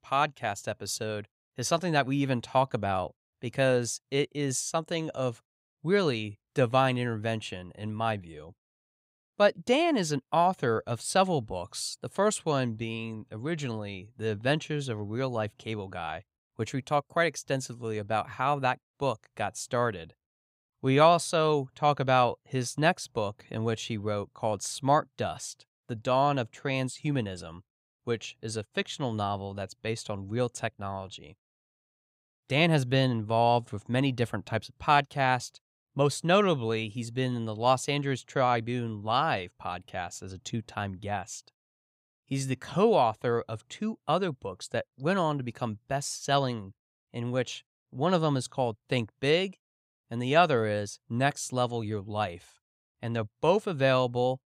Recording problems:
none

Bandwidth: 15.5 kHz